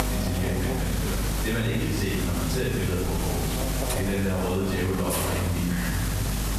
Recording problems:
room echo; strong; dies away in 1 s
off-mic speech; far
squashed, flat; somewhat
electrical hum; loud; throughout; 50 Hz, 8 dB below the speech
hiss; loud; throughout; 5 dB below the speech

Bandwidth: 14 kHz